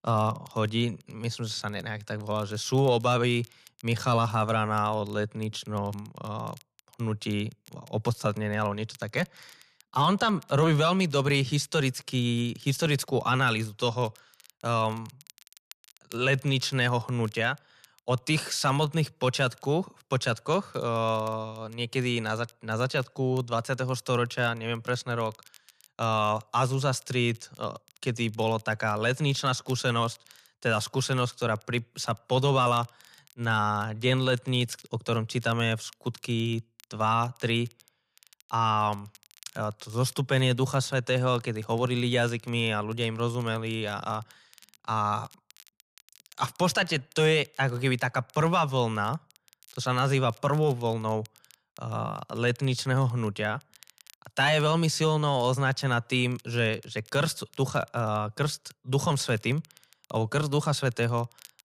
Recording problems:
crackle, like an old record; faint; 30 dB below the speech

